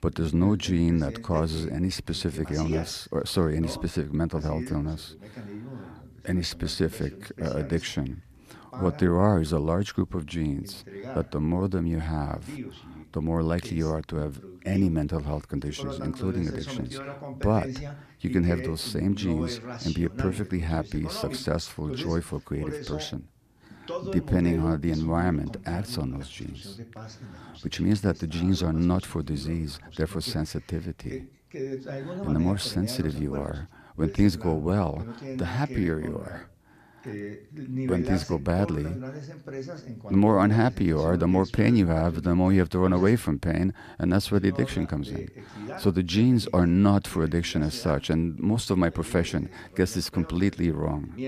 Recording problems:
voice in the background; noticeable; throughout; 10 dB below the speech

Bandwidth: 14.5 kHz